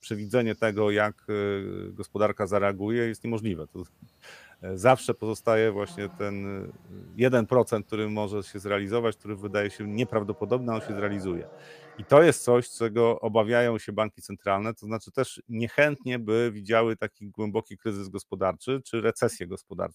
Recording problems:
animal sounds; faint; until 12 s; 25 dB below the speech

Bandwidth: 15 kHz